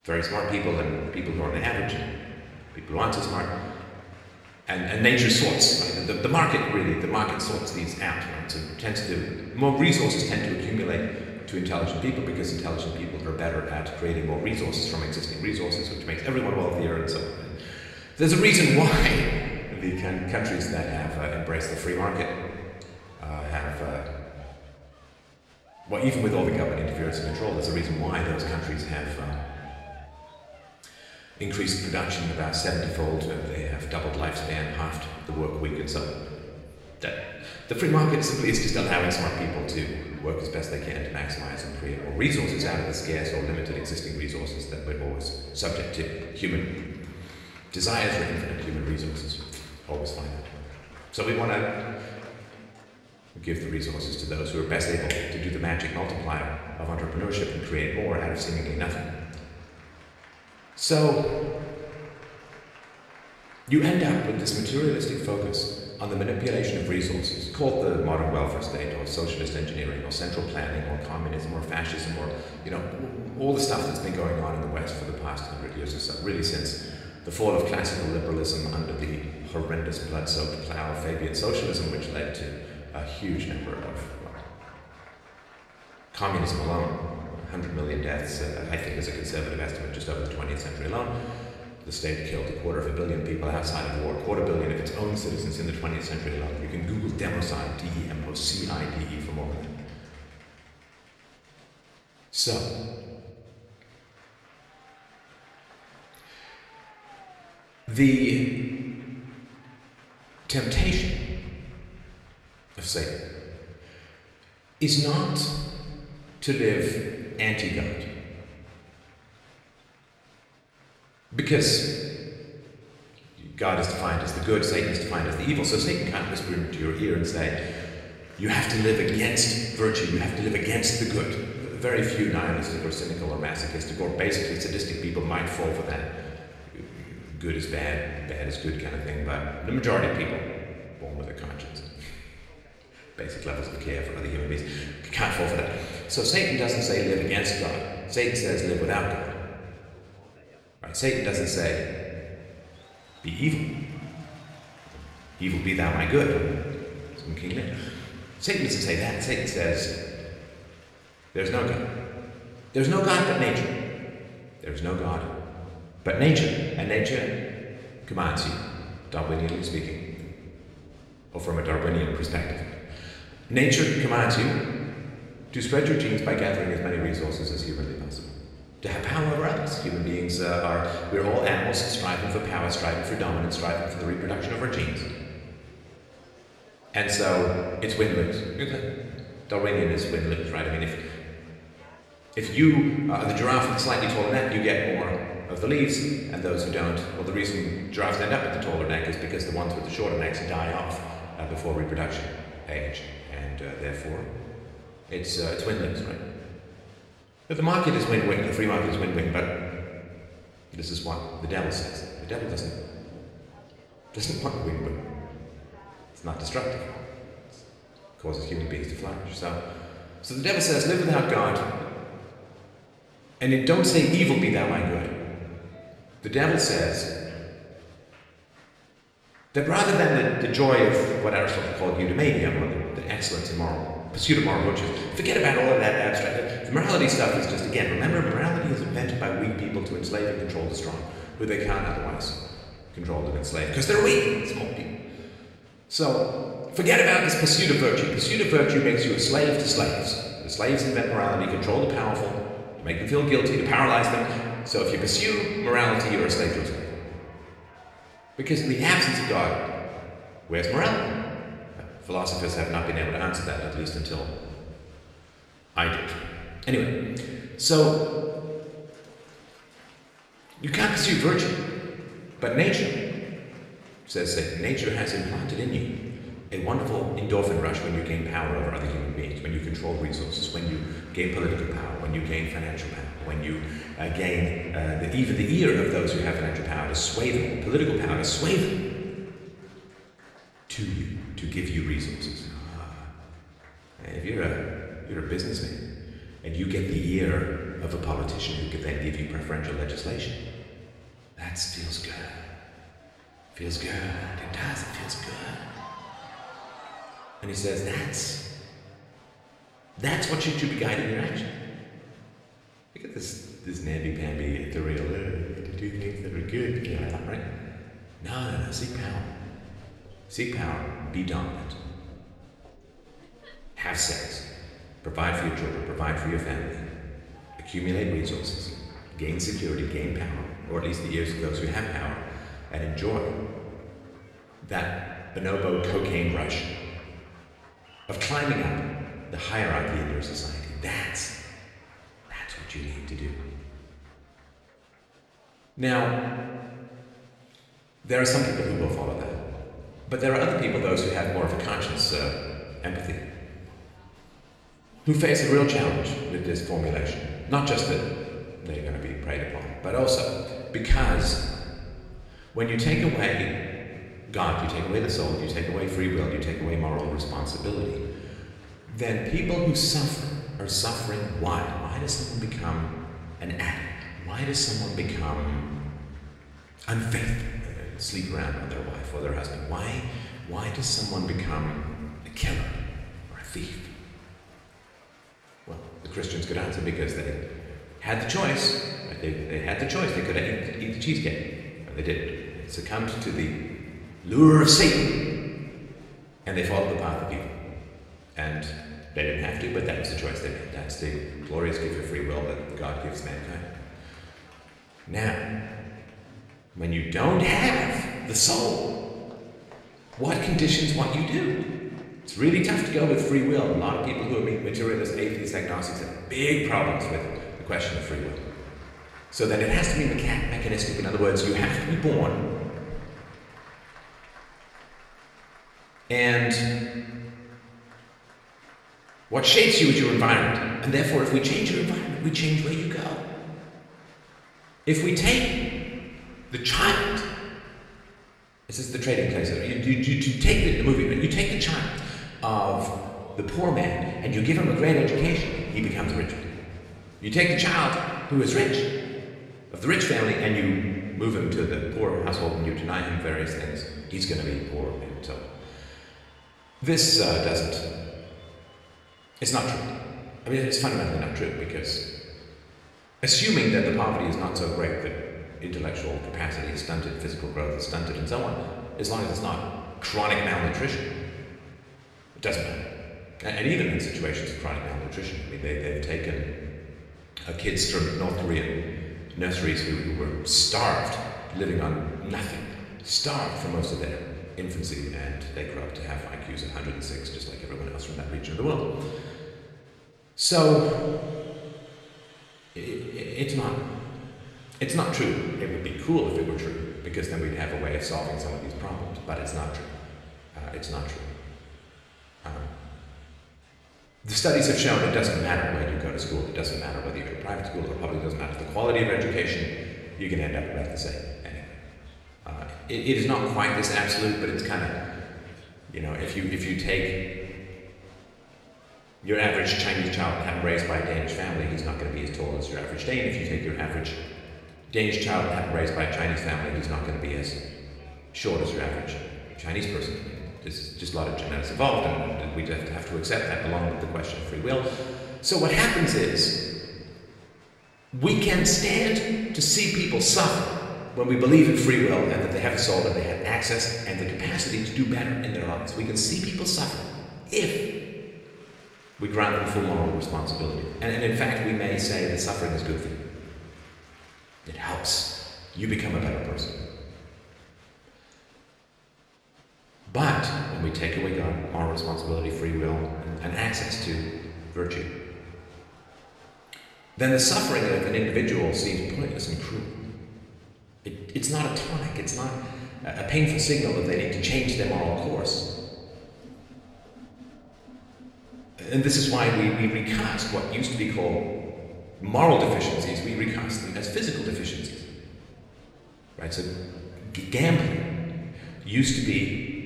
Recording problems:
off-mic speech; far
room echo; noticeable; dies away in 1.7 s
crowd noise; faint; throughout; 25 dB below the speech

